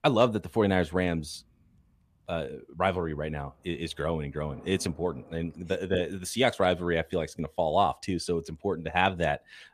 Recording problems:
rain or running water; faint; throughout; 30 dB below the speech

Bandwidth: 14.5 kHz